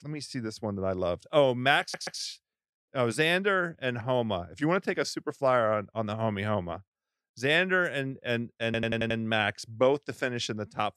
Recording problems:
audio stuttering; at 2 s and at 8.5 s

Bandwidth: 13.5 kHz